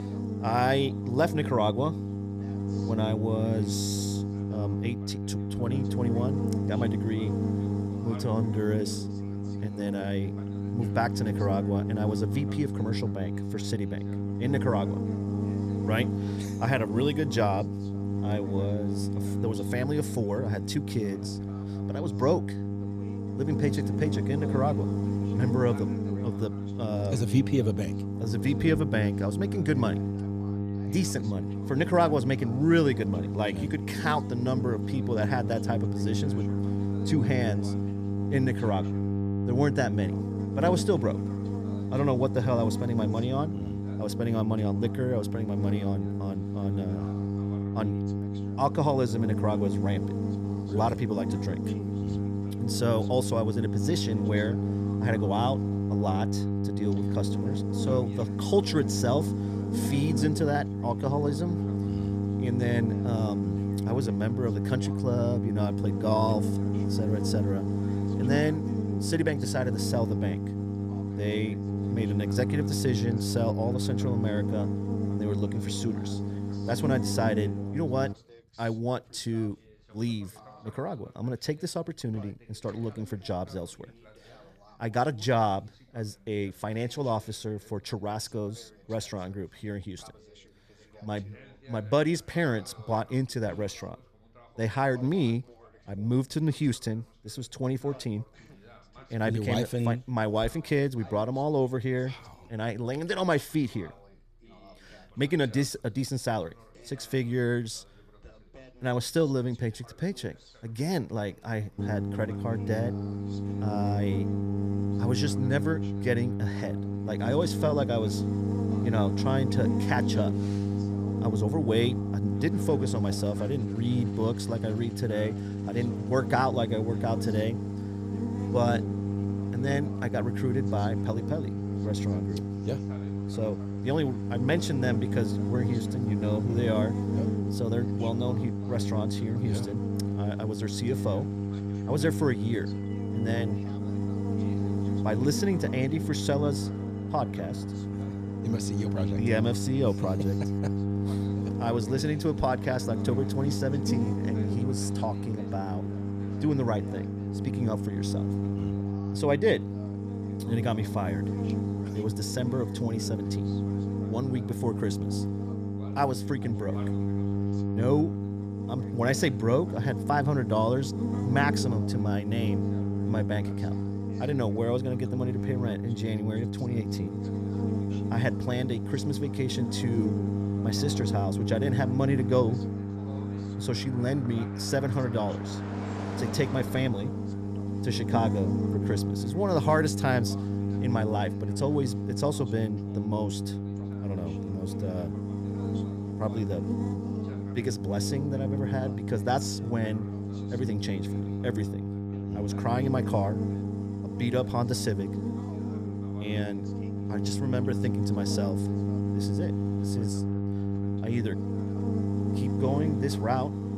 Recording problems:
electrical hum; loud; until 1:18 and from 1:52 on; 50 Hz, 6 dB below the speech
traffic noise; faint; throughout; 25 dB below the speech
background chatter; faint; throughout; 2 voices, 25 dB below the speech

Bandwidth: 14.5 kHz